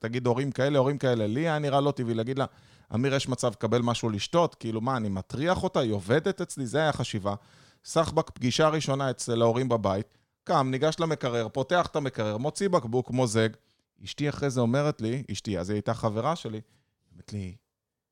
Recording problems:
none

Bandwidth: 17 kHz